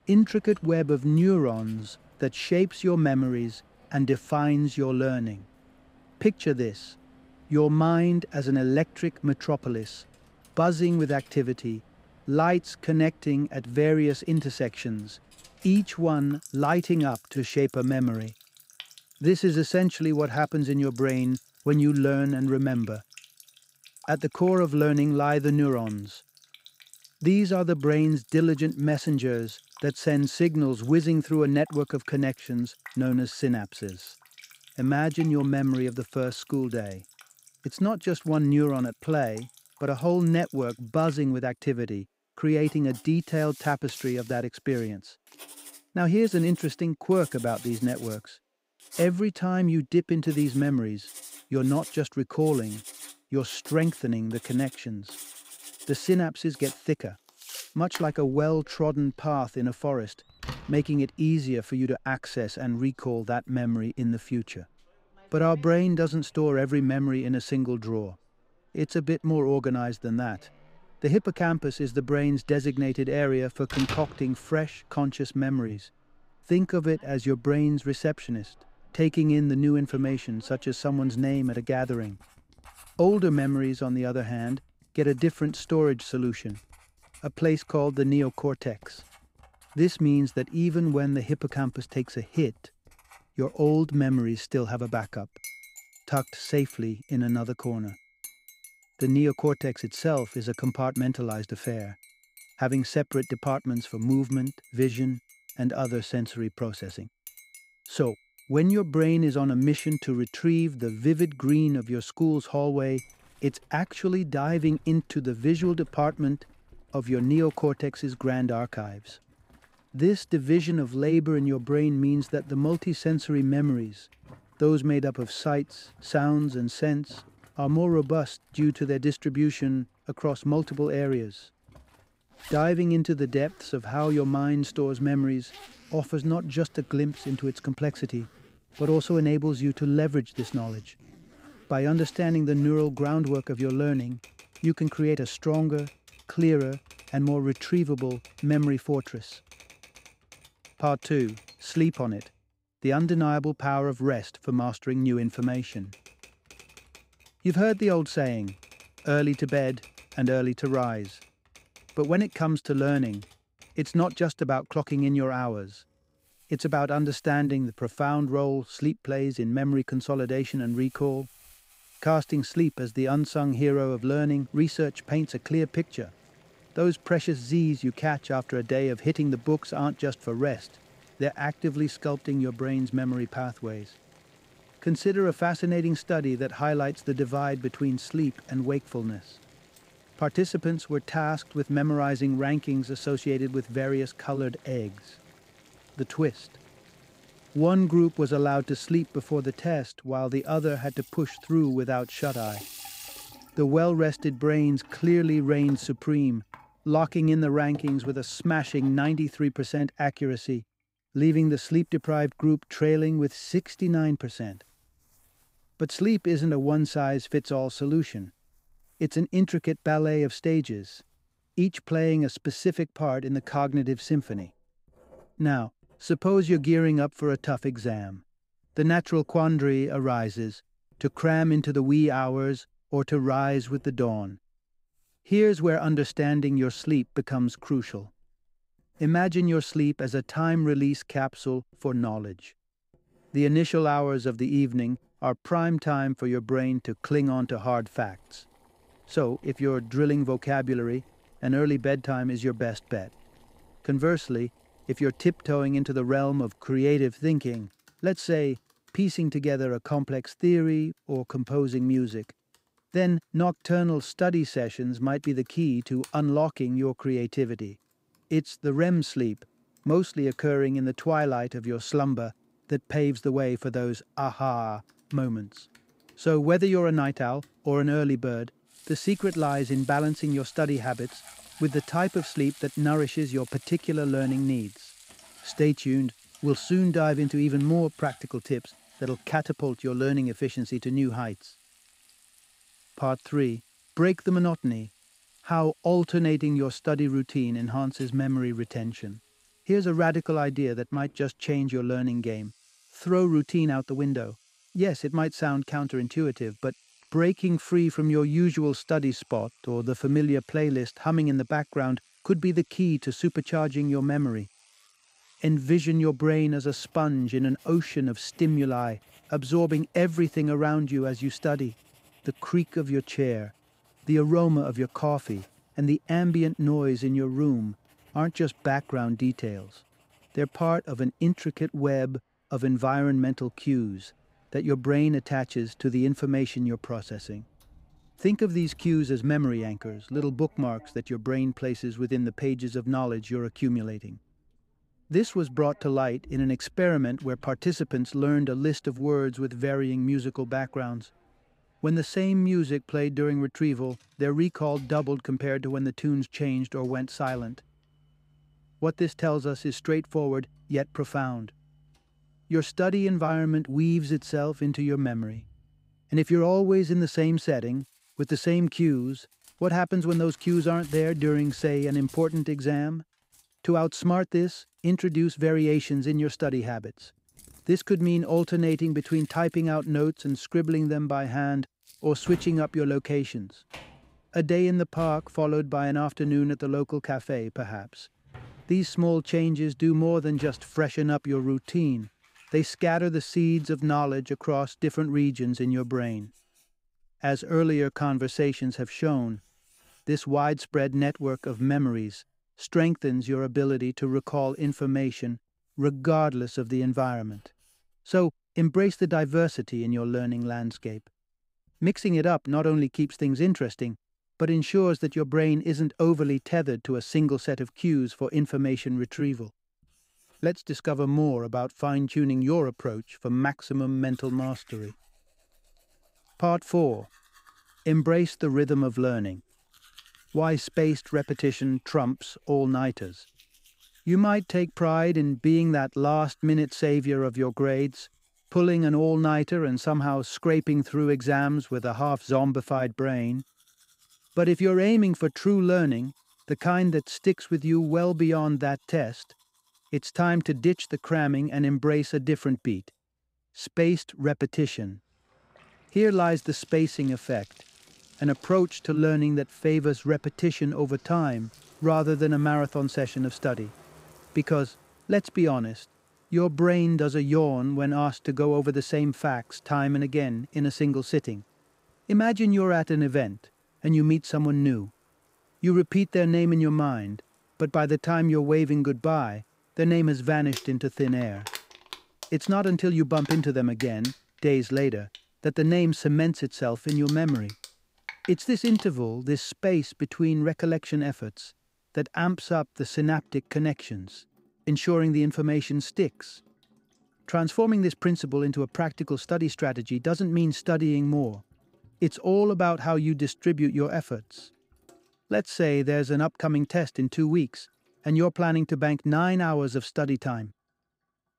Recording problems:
household noises; faint; throughout; 25 dB below the speech

